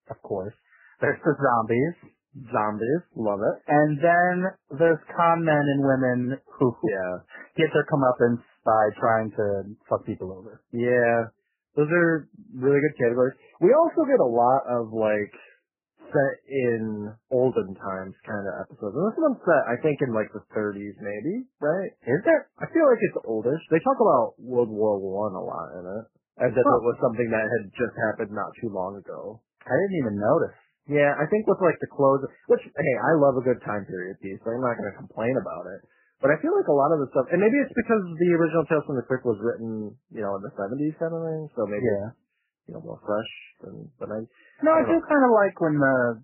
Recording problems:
garbled, watery; badly; nothing above 3 kHz

